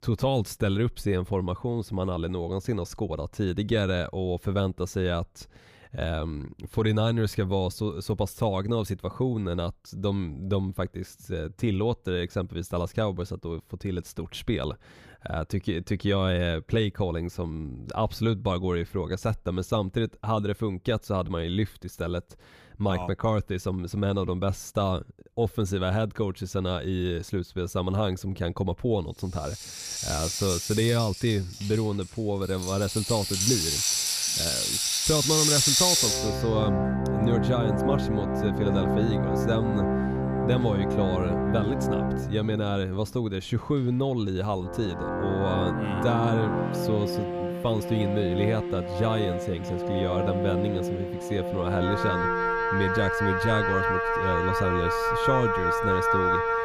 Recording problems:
background music; very loud; from 30 s on; 2 dB above the speech

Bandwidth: 15 kHz